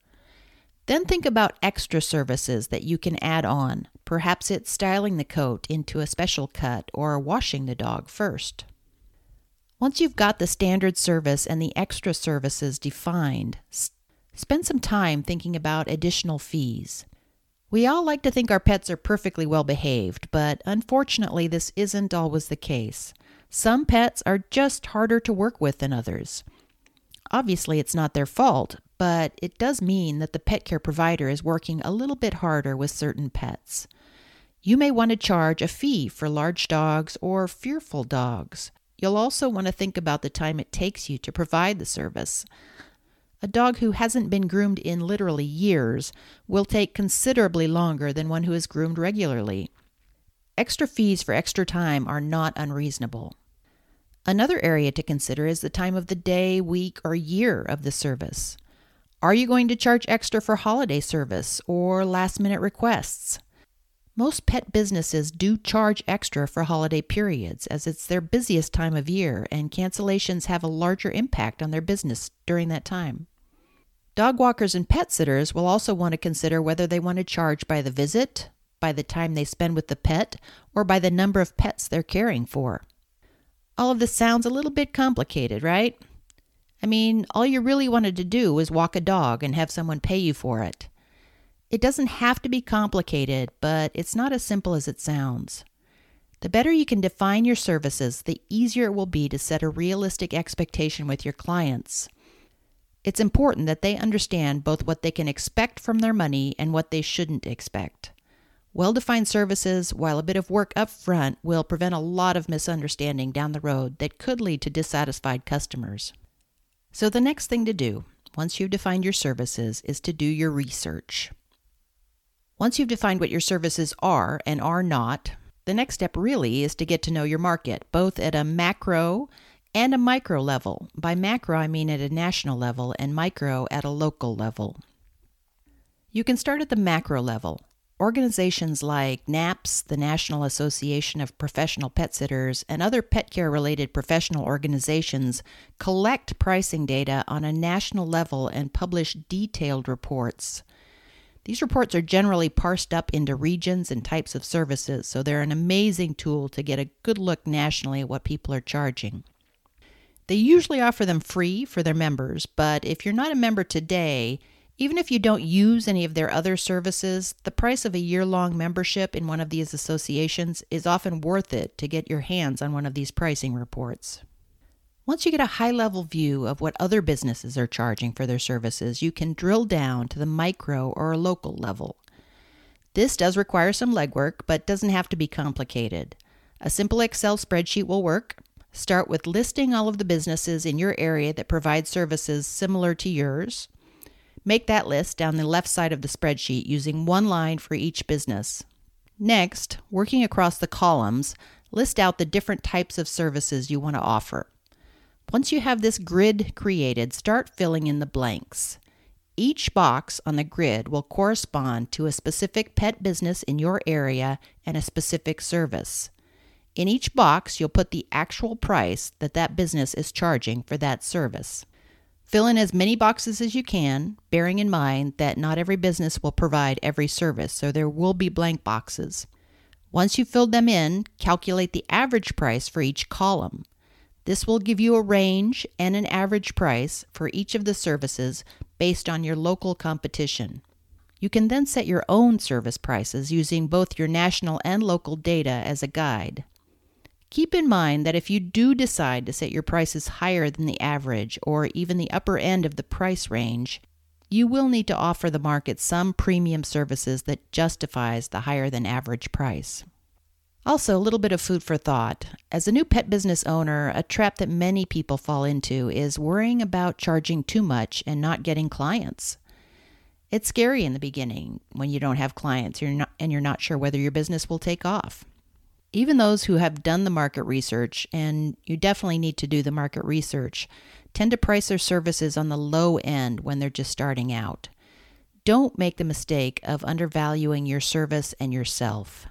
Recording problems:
none

